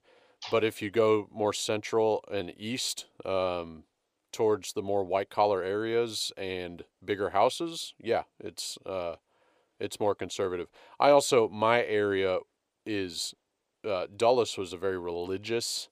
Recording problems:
none

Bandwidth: 15 kHz